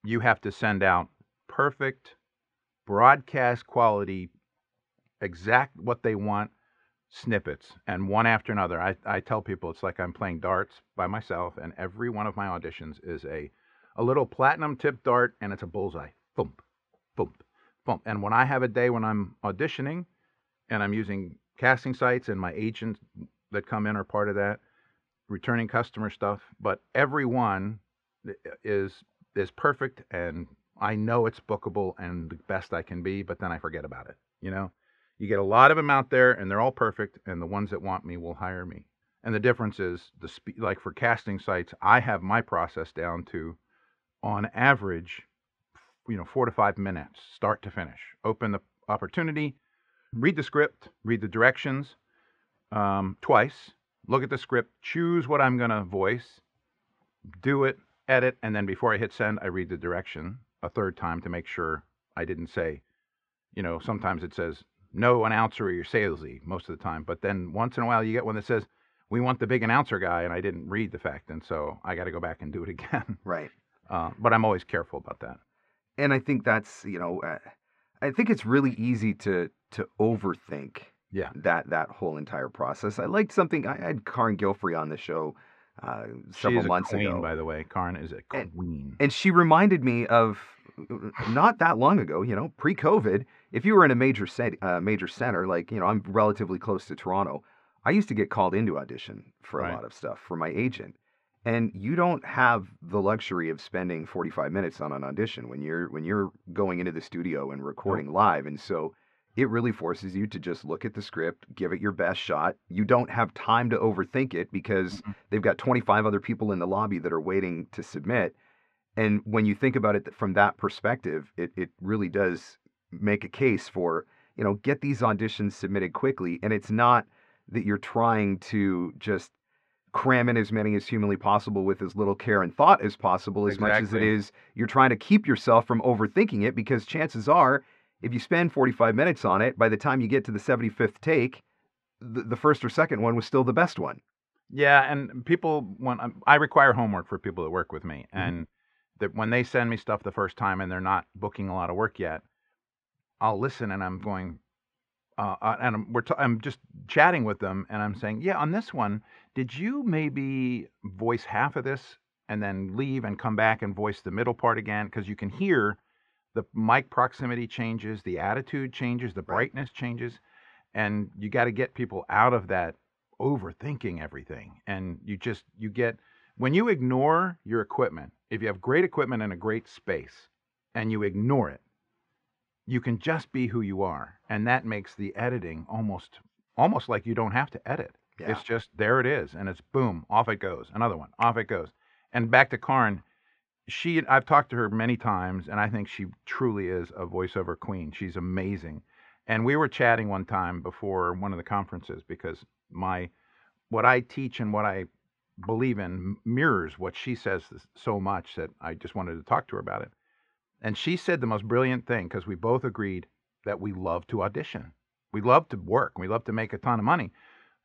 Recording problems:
muffled; very; fading above 2 kHz

